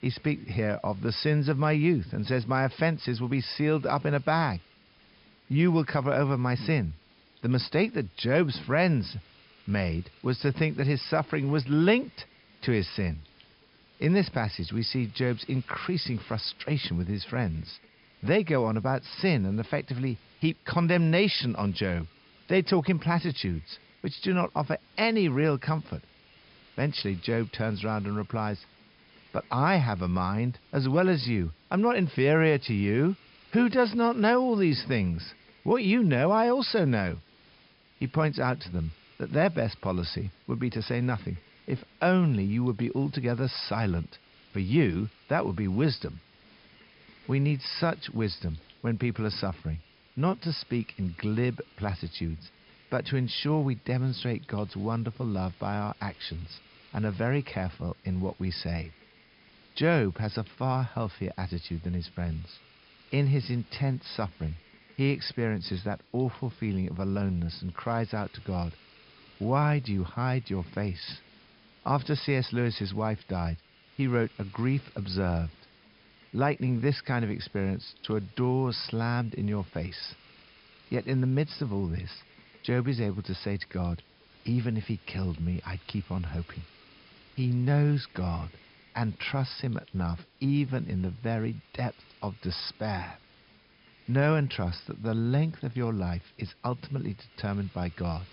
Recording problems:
high frequencies cut off; noticeable; nothing above 5.5 kHz
hiss; faint; throughout; 25 dB below the speech

